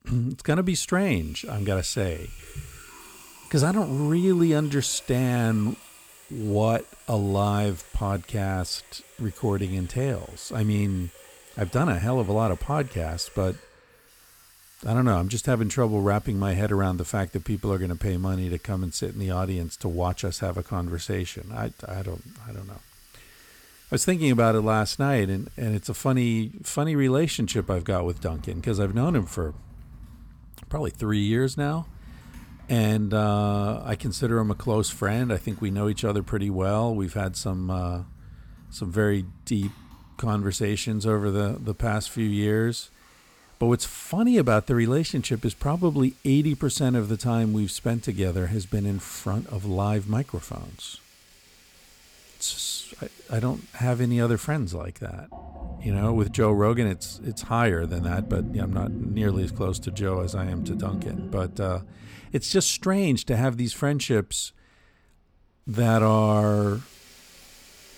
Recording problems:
household noises; noticeable; throughout; 15 dB below the speech

